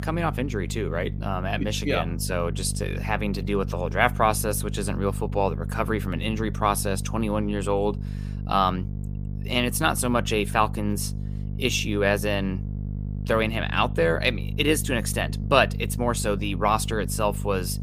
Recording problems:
electrical hum; noticeable; throughout; 50 Hz, 20 dB below the speech

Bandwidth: 15 kHz